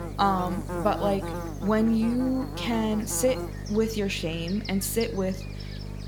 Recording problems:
electrical hum; loud; throughout; 50 Hz, 10 dB below the speech

